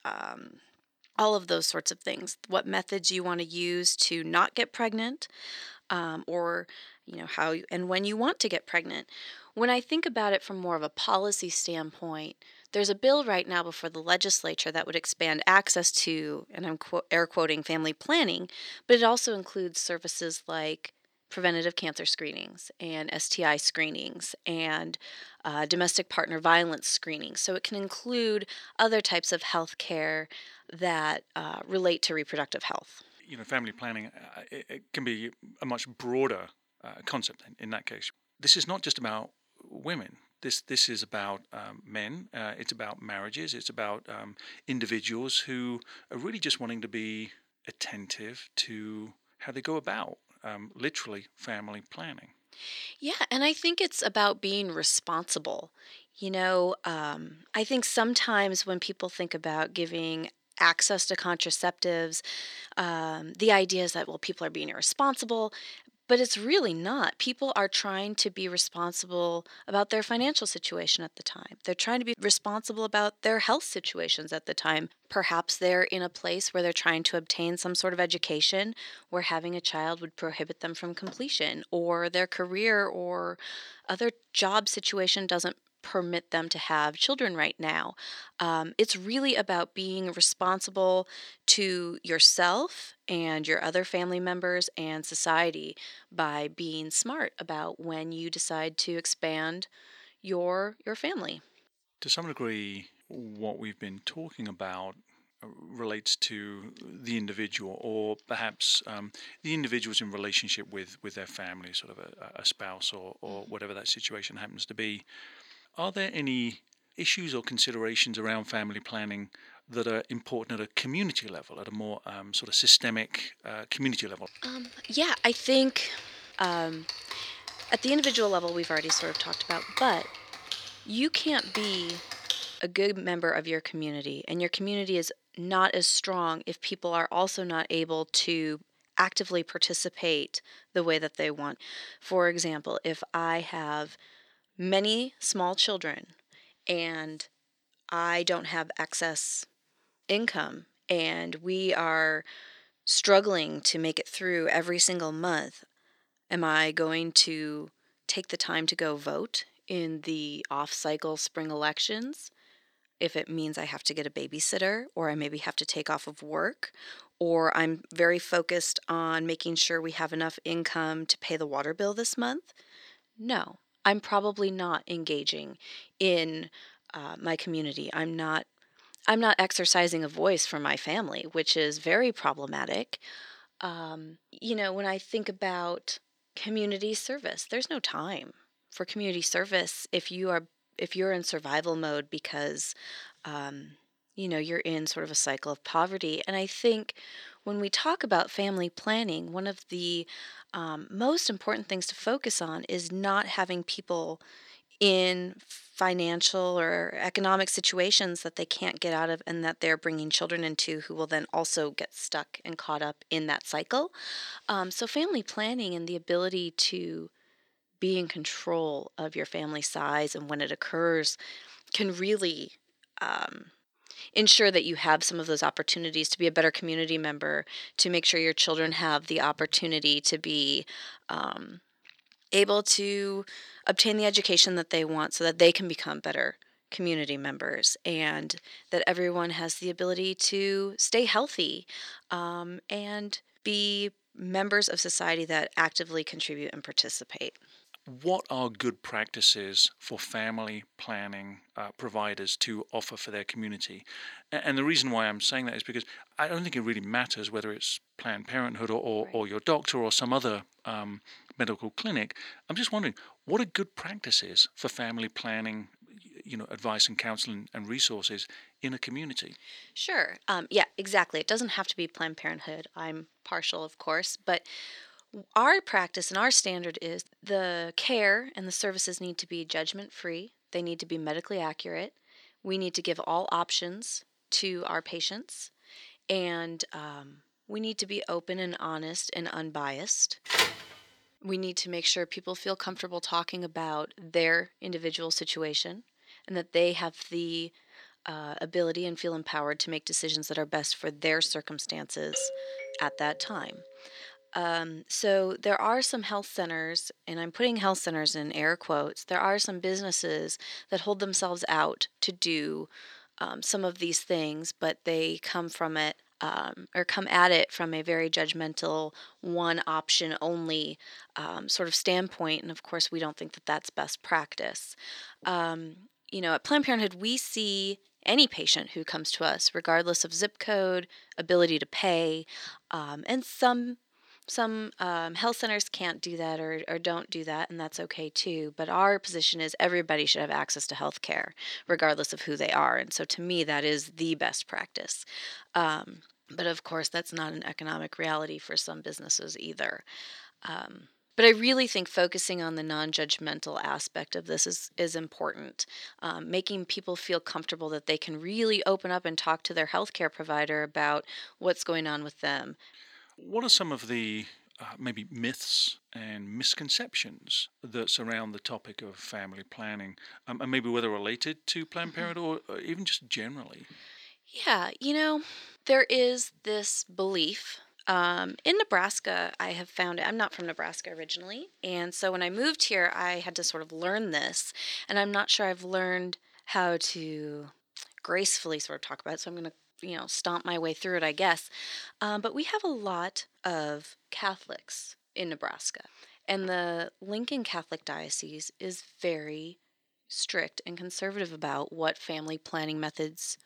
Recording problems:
thin; somewhat; fading below 300 Hz
keyboard typing; noticeable; from 2:04 to 2:12; peak 2 dB below the speech
phone ringing; loud; at 4:50; peak 4 dB above the speech
doorbell; noticeable; from 5:02 to 5:04; peak 8 dB below the speech

